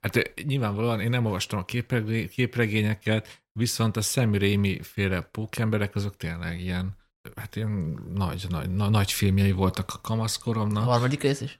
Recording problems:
none

